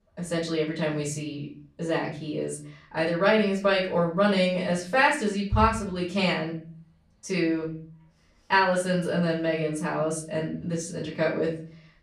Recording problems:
off-mic speech; far
room echo; slight; dies away in 0.4 s

